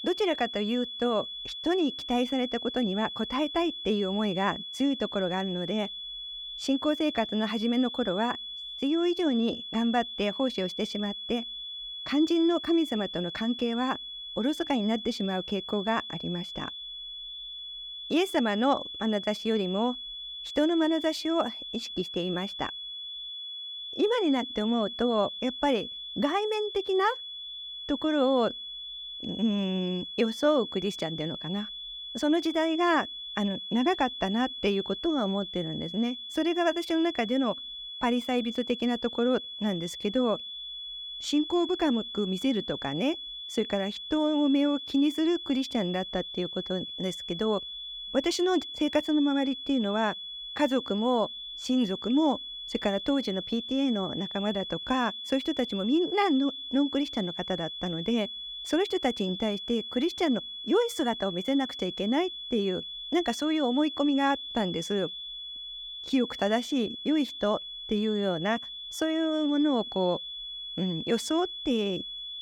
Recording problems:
high-pitched whine; loud; throughout; 3.5 kHz, 8 dB below the speech

